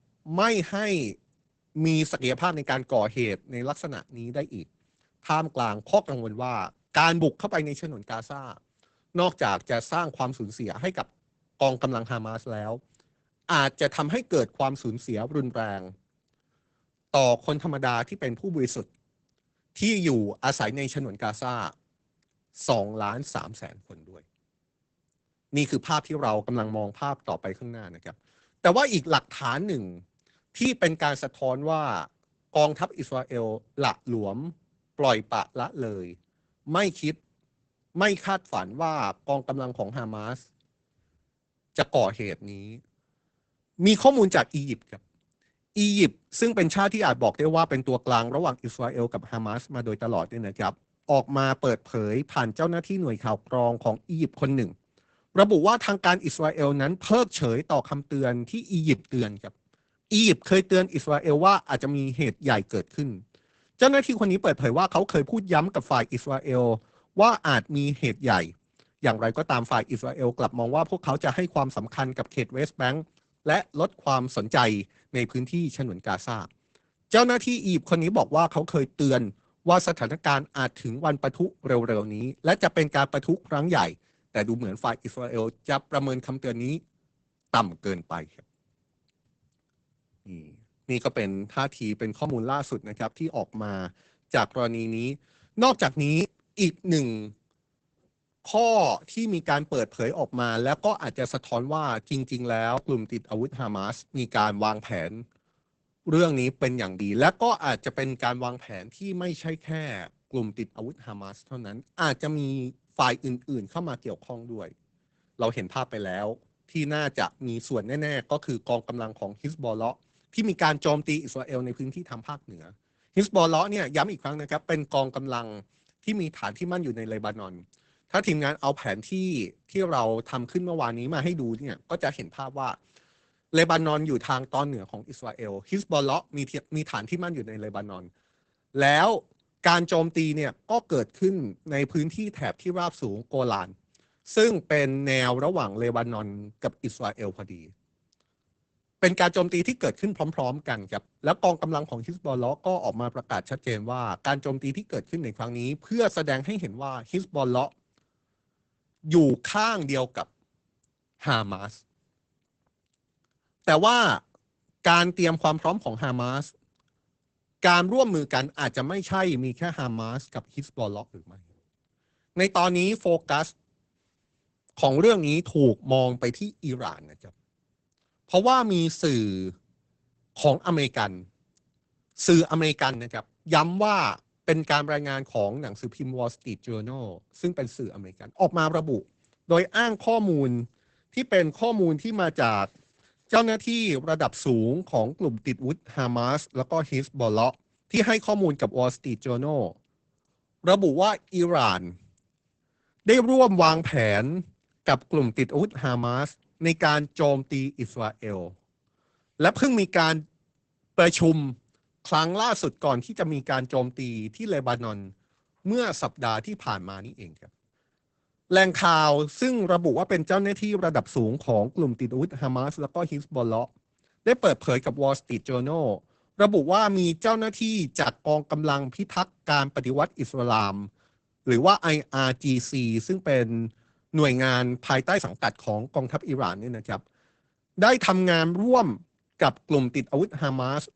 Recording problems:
garbled, watery; badly; nothing above 8 kHz

